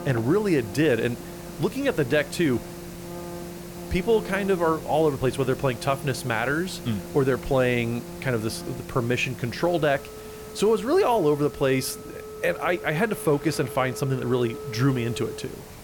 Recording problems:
background music; noticeable; throughout; 15 dB below the speech
hiss; noticeable; throughout; 20 dB below the speech
rain or running water; faint; throughout; 25 dB below the speech

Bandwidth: 18 kHz